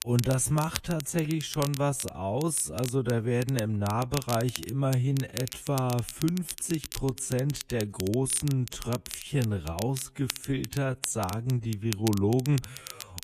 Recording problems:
wrong speed, natural pitch; too slow; 0.6 times normal speed
crackle, like an old record; noticeable; 10 dB below the speech

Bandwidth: 14.5 kHz